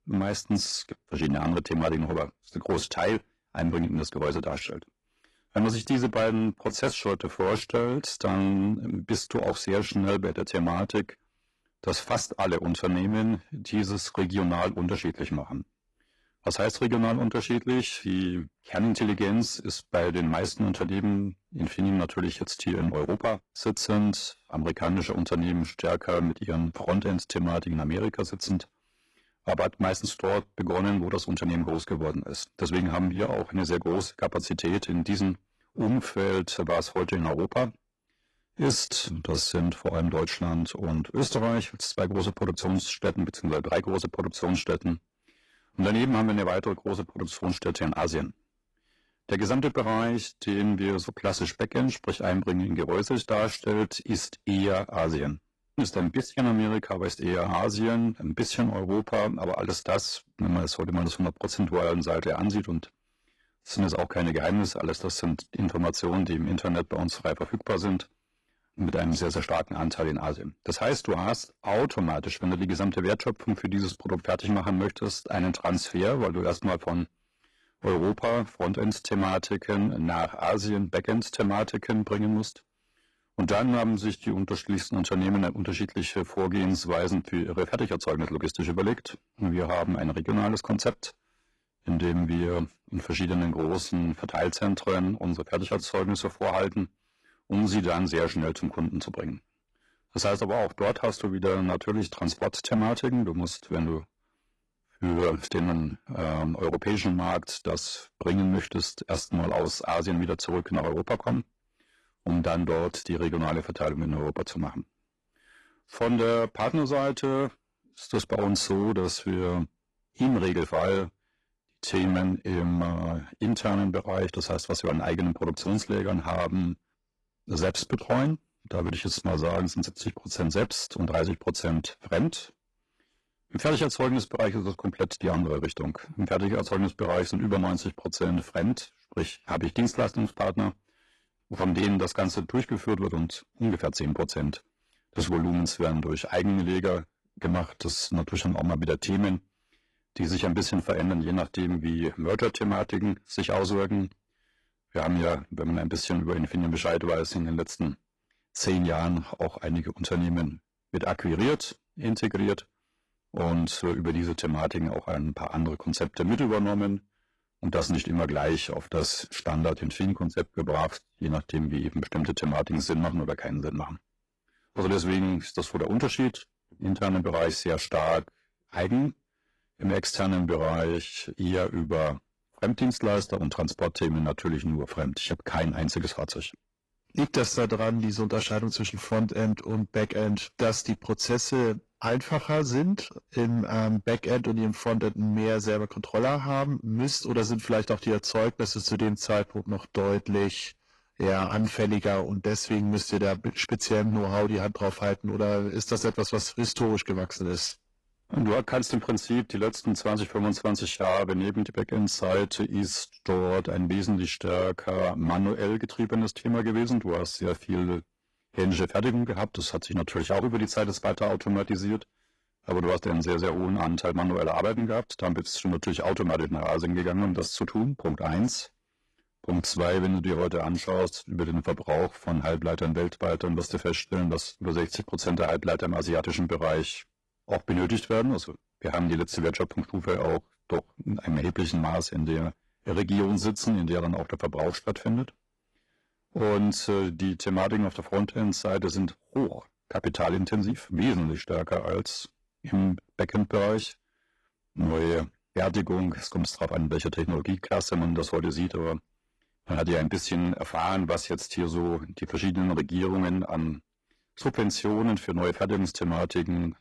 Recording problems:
distortion; slight; 6% of the sound clipped
garbled, watery; slightly; nothing above 11 kHz

